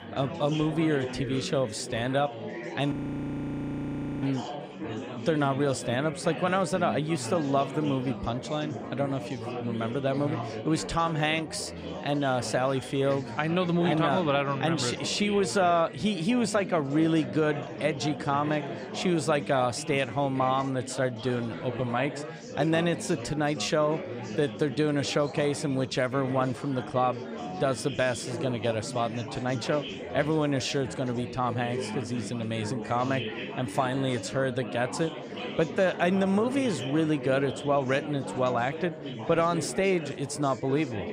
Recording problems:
chatter from many people; loud; throughout; 9 dB below the speech
audio freezing; at 3 s for 1.5 s

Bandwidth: 15.5 kHz